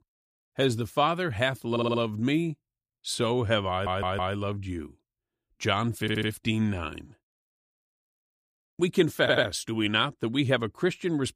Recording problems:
audio stuttering; 4 times, first at 1.5 s

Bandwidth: 15 kHz